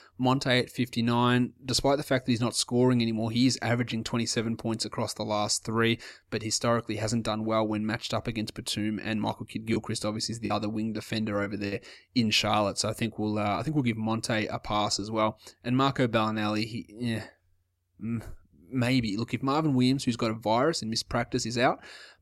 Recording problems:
choppy; occasionally; from 9.5 to 12 s; 5% of the speech affected

